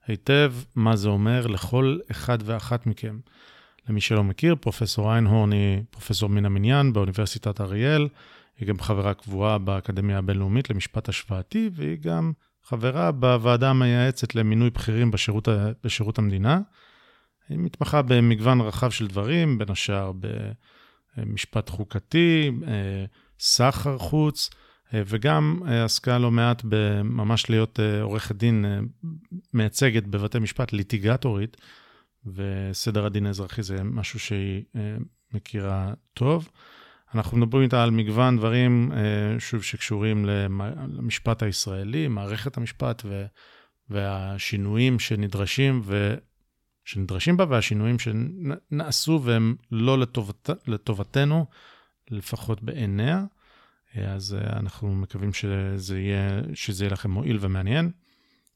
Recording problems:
none

